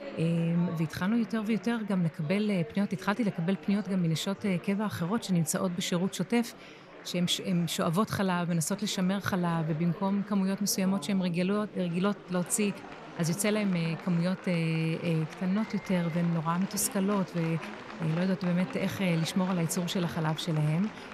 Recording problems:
murmuring crowd; noticeable; throughout; 15 dB below the speech

